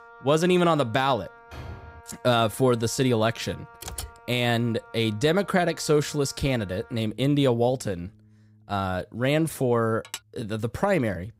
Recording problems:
background music; faint; throughout; 25 dB below the speech
door banging; faint; at 1.5 s; peak 15 dB below the speech
keyboard typing; faint; at 4 s; peak 10 dB below the speech
clattering dishes; faint; at 10 s; peak 15 dB below the speech

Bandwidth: 15.5 kHz